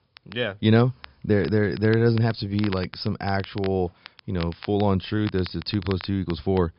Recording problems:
high frequencies cut off; noticeable; nothing above 5.5 kHz
crackle, like an old record; noticeable; 20 dB below the speech

